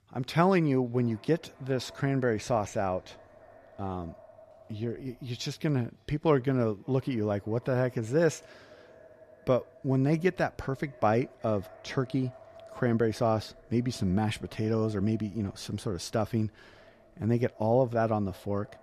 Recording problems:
echo of what is said; faint; throughout; 570 ms later, 25 dB below the speech

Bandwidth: 14 kHz